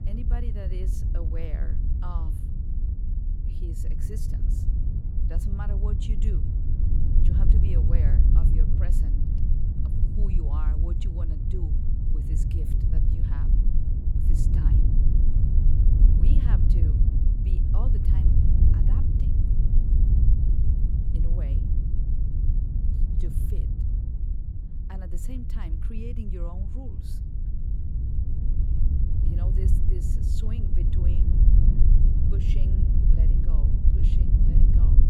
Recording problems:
wind noise on the microphone; heavy; 4 dB above the speech

